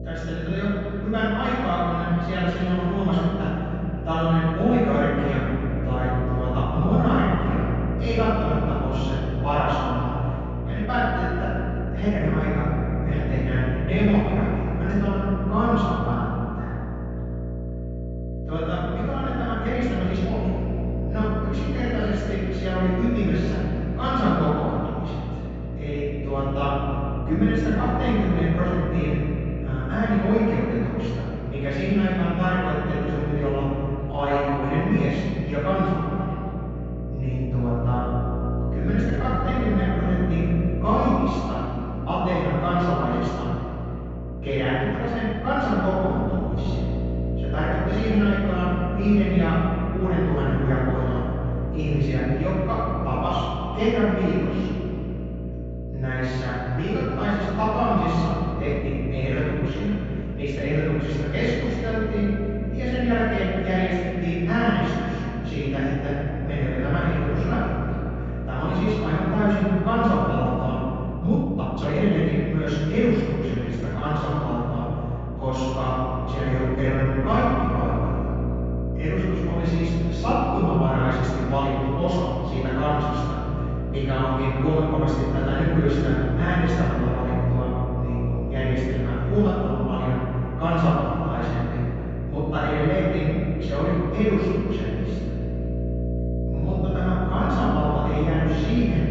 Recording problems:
room echo; strong; dies away in 2.8 s
off-mic speech; far
high frequencies cut off; noticeable; nothing above 8 kHz
electrical hum; noticeable; throughout; 60 Hz, 10 dB below the speech
uneven, jittery; strongly; from 2.5 s to 1:32

